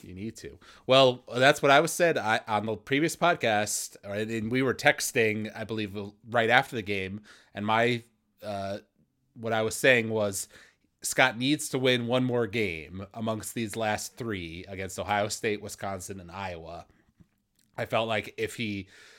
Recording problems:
none

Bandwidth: 16.5 kHz